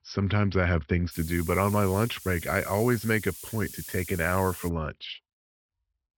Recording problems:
high frequencies cut off; noticeable; nothing above 5.5 kHz
hiss; noticeable; from 1 to 4.5 s; 10 dB below the speech

